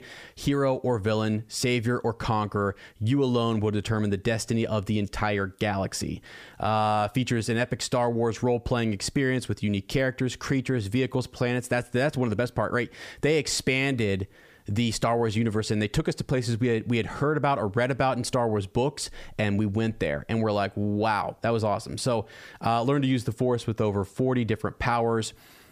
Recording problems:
squashed, flat; somewhat

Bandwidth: 15 kHz